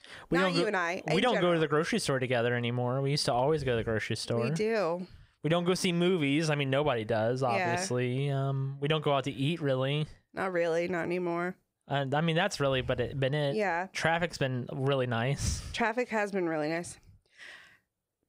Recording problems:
squashed, flat; heavily

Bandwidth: 15.5 kHz